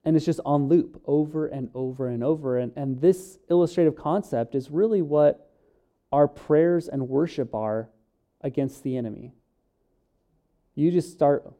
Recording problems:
muffled; very; fading above 1 kHz

